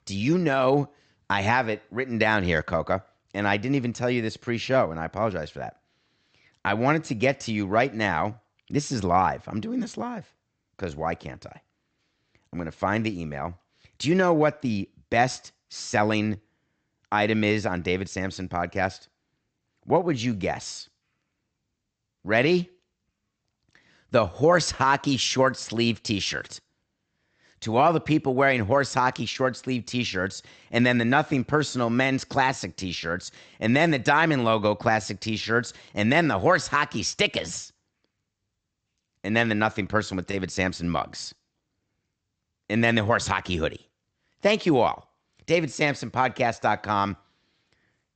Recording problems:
high frequencies cut off; noticeable; nothing above 8 kHz

